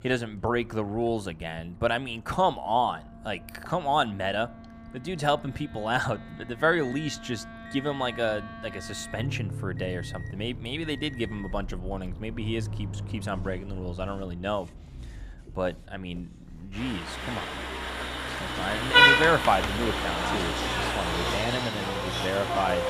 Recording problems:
traffic noise; very loud; throughout; 4 dB above the speech
household noises; noticeable; throughout; 15 dB below the speech
background music; noticeable; throughout; 15 dB below the speech

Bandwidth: 15 kHz